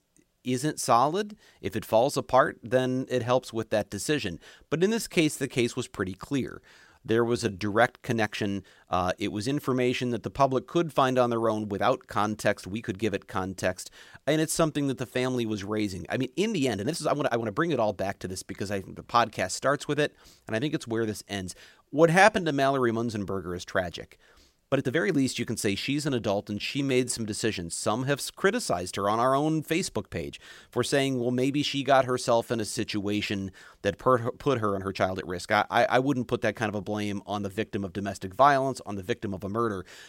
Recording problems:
uneven, jittery; strongly; from 4.5 to 36 s

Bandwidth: 16 kHz